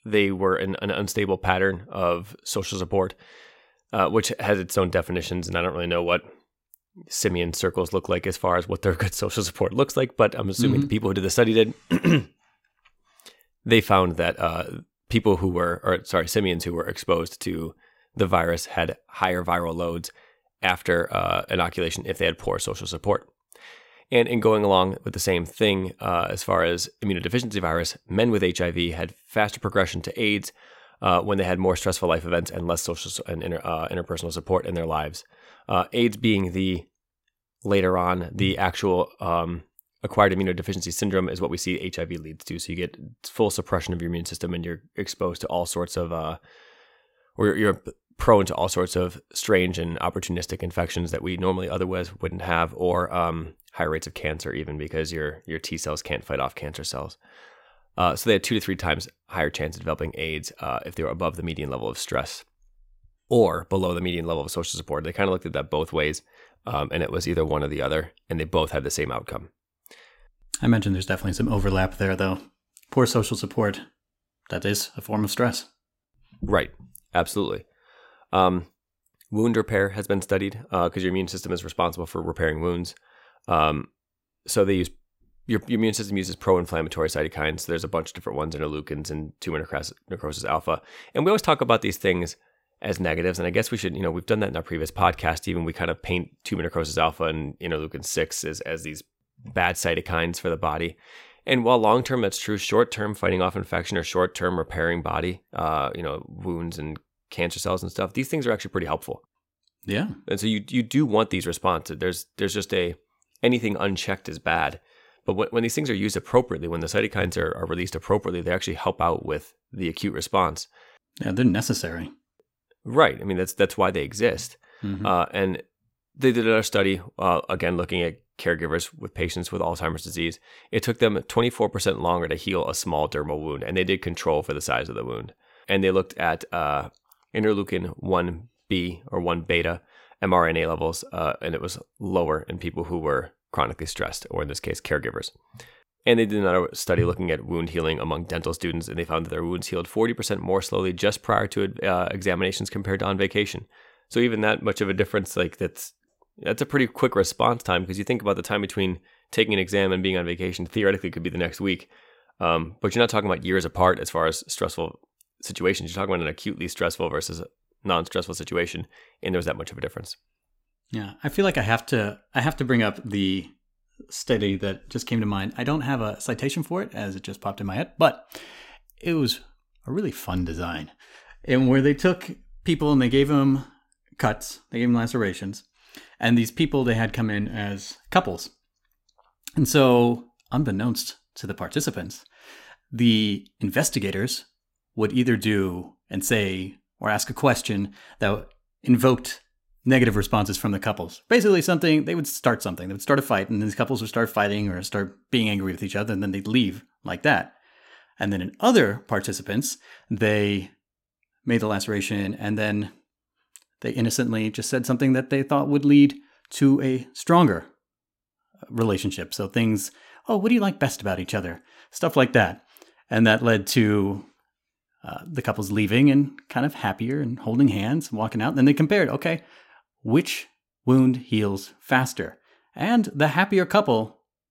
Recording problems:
none

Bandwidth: 16 kHz